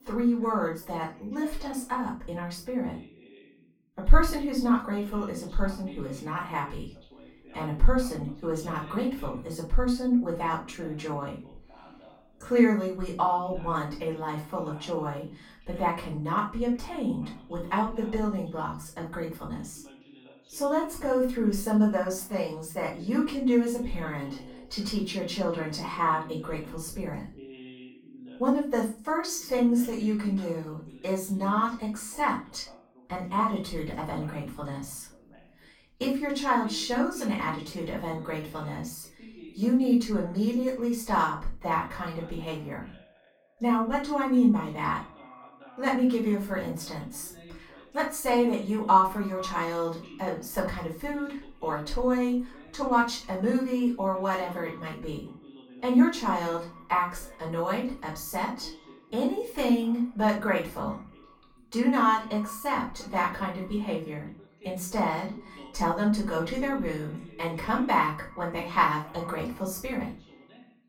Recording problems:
off-mic speech; far
echo of what is said; faint; from 43 s on; 190 ms later, 25 dB below the speech
room echo; slight; dies away in 0.3 s
voice in the background; faint; throughout; 20 dB below the speech

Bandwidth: 18 kHz